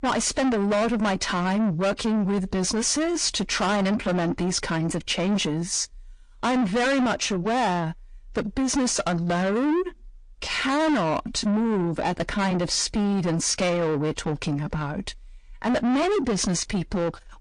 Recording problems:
distortion; heavy; 6 dB below the speech
garbled, watery; slightly; nothing above 8.5 kHz

